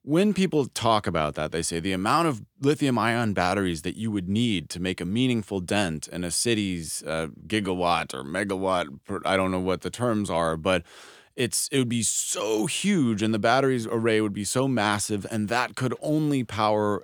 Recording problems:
none

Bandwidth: 19 kHz